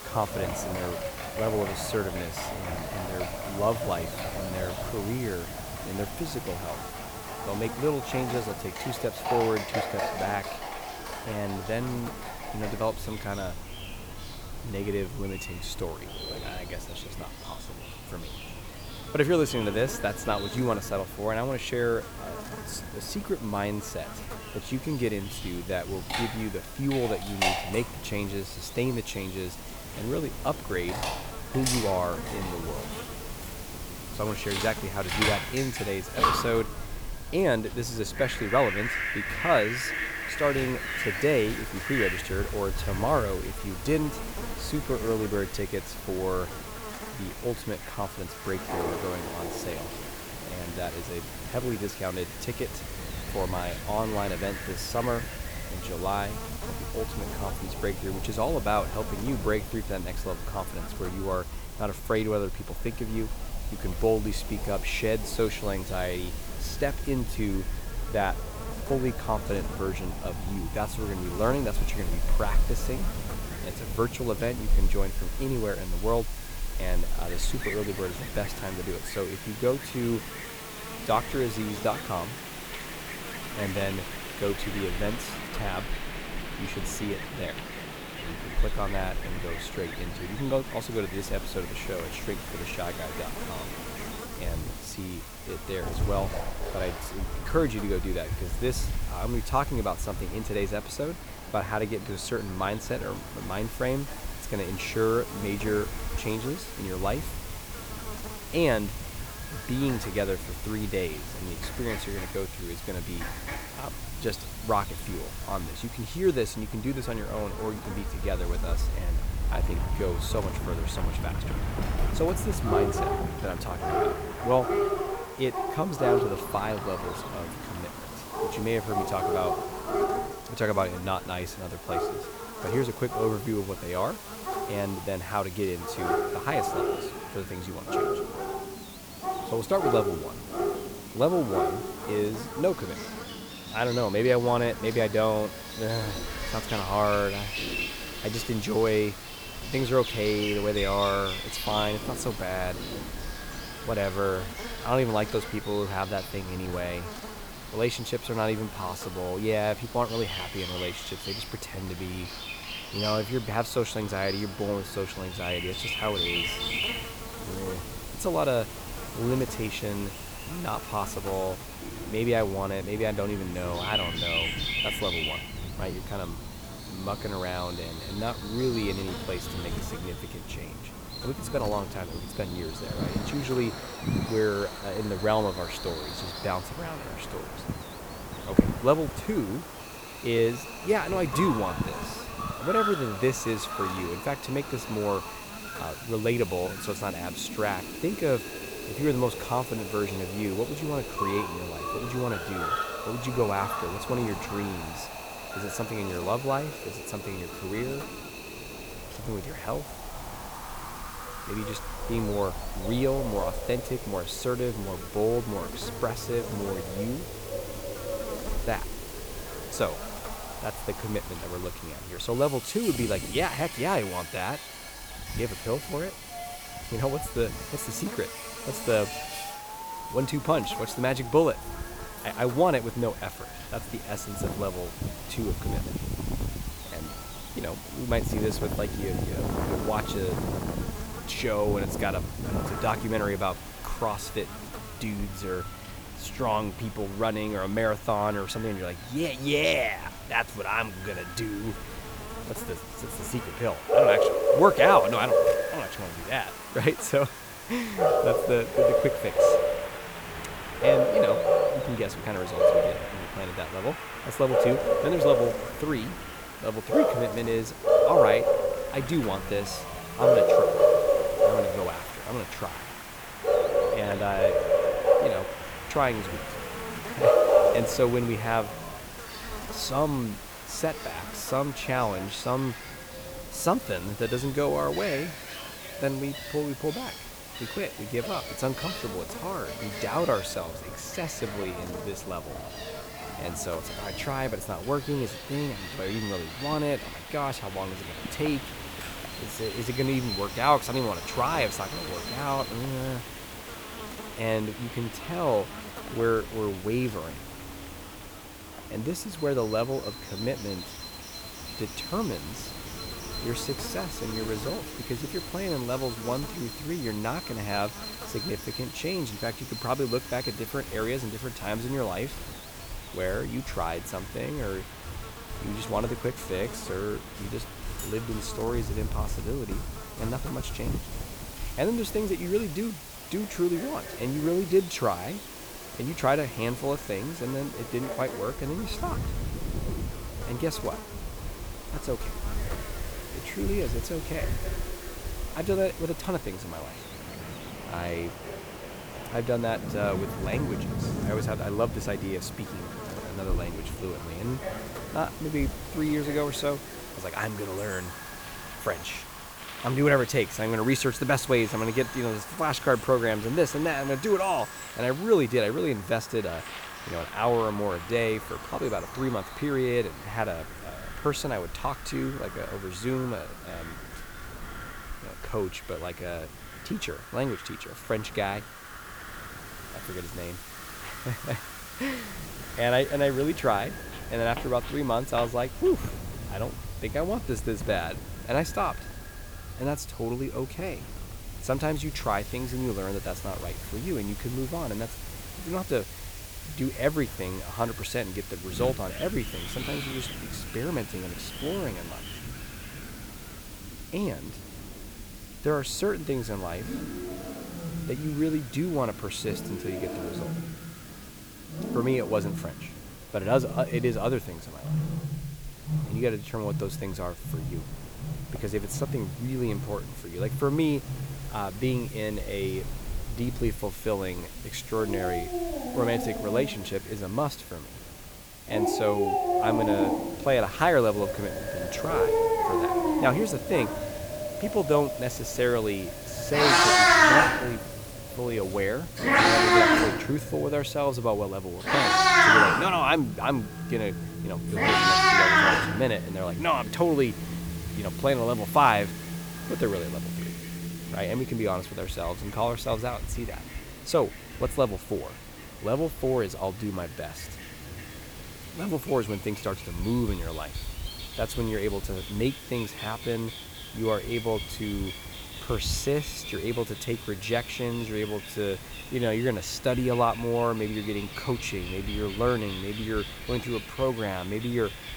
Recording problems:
echo of what is said; faint; throughout; 210 ms later, 25 dB below the speech
animal sounds; very loud; throughout; as loud as the speech
electrical hum; noticeable; until 5:59; 60 Hz, 15 dB below the speech
wind in the background; noticeable; throughout; 10 dB below the speech
hiss; noticeable; throughout; 15 dB below the speech

